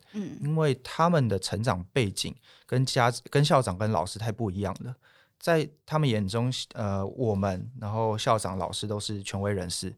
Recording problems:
none

